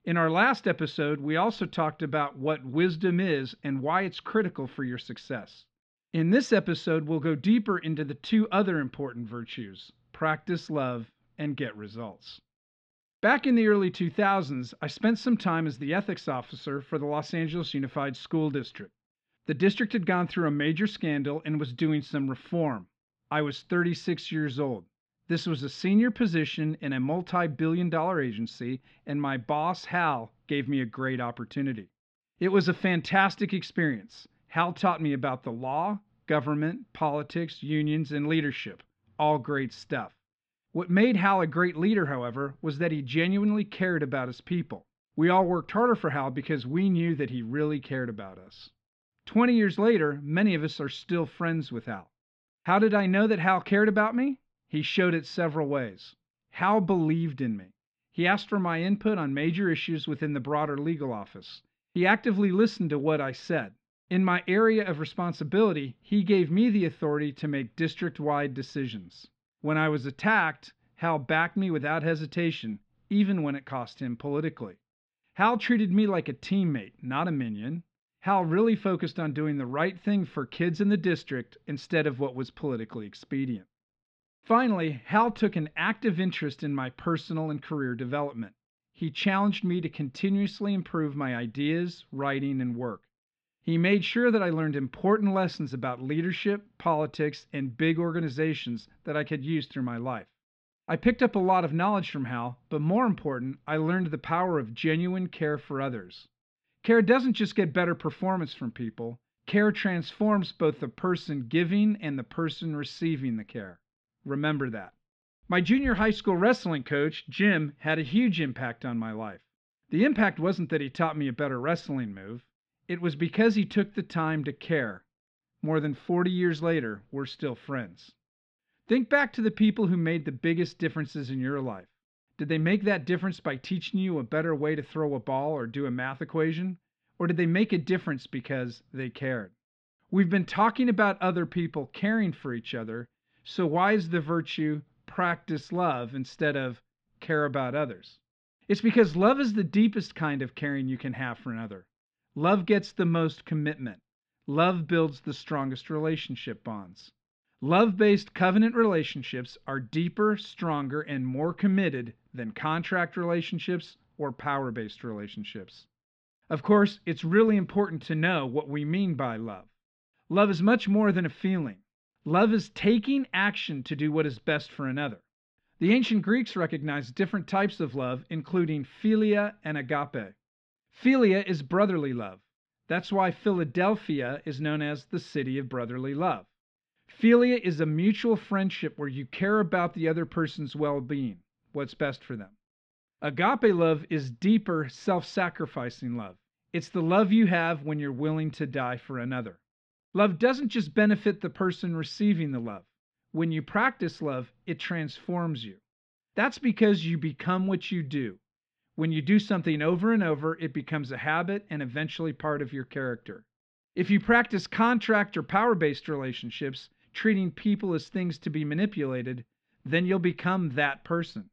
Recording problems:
muffled; slightly; fading above 3.5 kHz

